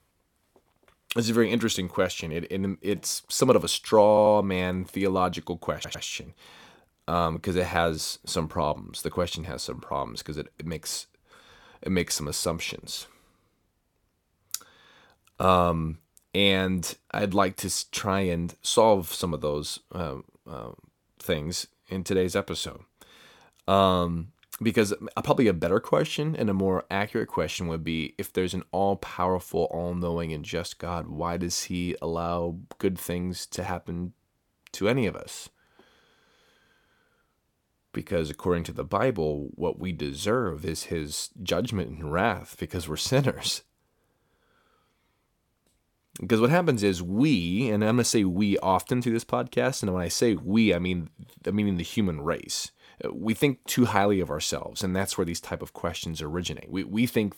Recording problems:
audio stuttering; at 4 s and at 5.5 s

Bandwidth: 17.5 kHz